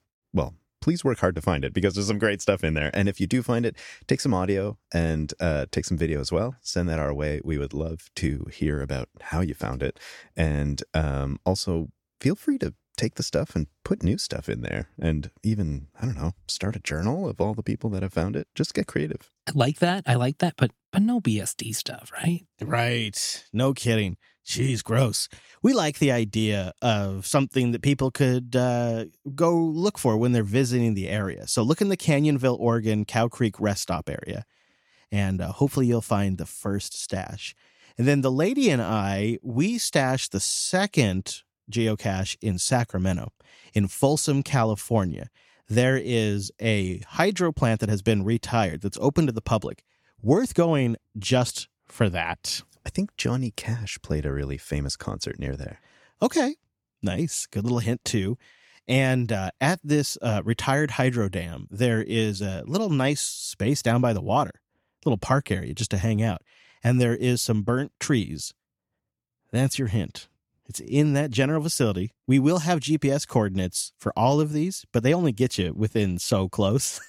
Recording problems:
none

